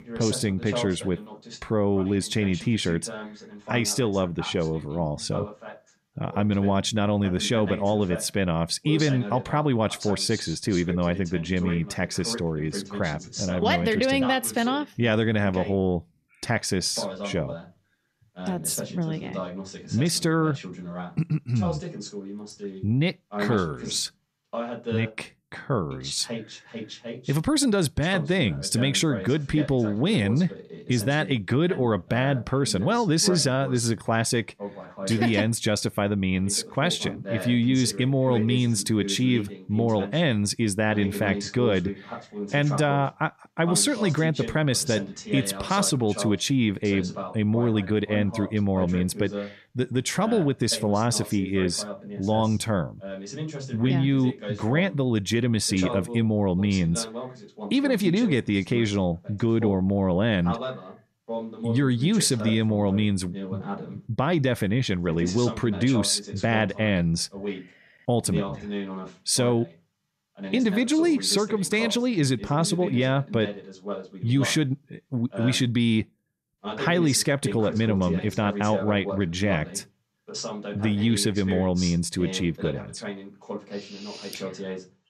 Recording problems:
voice in the background; noticeable; throughout; 10 dB below the speech

